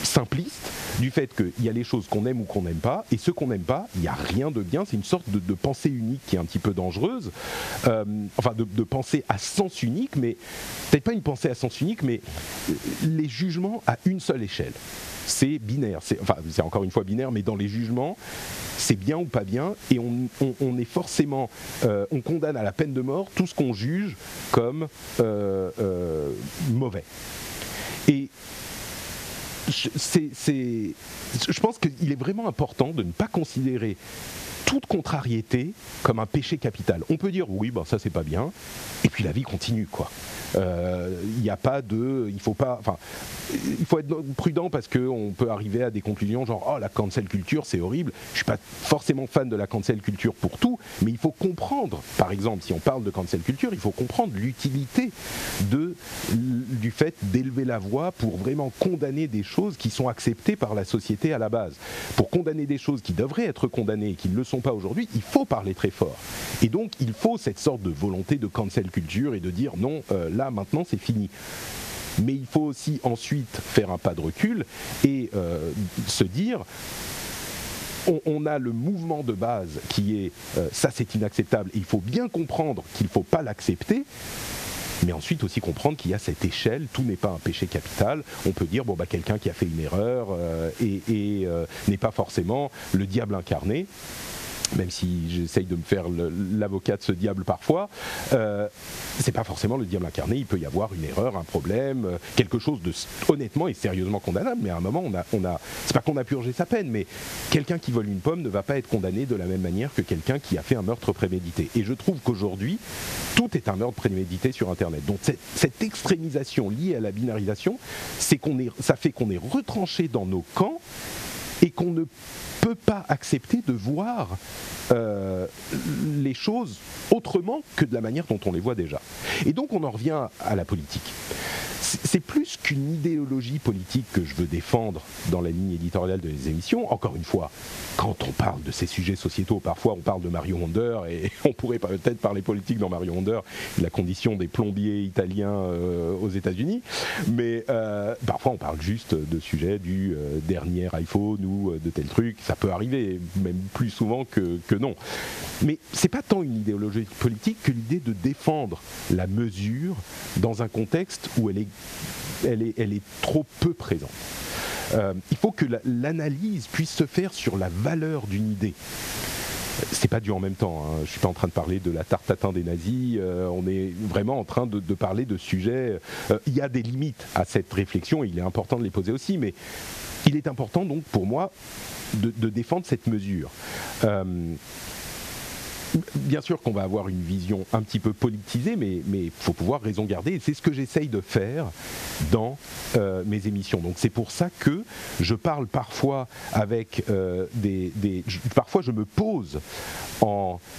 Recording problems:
muffled; very slightly; fading above 3 kHz
squashed, flat; somewhat
hiss; noticeable; throughout; 15 dB below the speech

